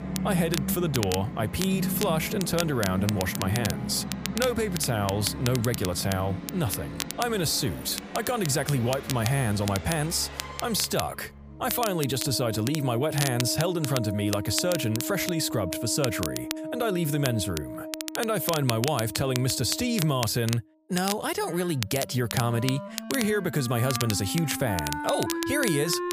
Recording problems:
background music; loud; throughout; 9 dB below the speech
crackle, like an old record; loud; 8 dB below the speech

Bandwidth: 15 kHz